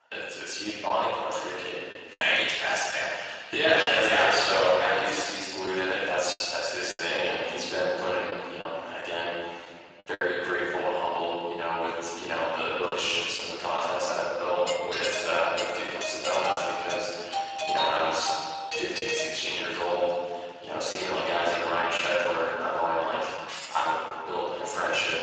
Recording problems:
room echo; strong; dies away in 1.7 s
off-mic speech; far
thin; very; fading below 750 Hz
garbled, watery; slightly; nothing above 7.5 kHz
choppy; occasionally; 3% of the speech affected
doorbell; loud; from 15 to 20 s; peak level with the speech
jangling keys; noticeable; at 23 s; peak 10 dB below the speech

